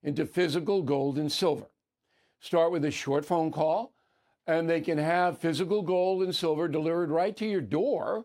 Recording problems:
none

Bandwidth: 16 kHz